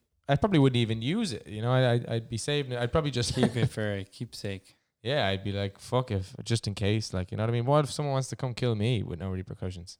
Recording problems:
none

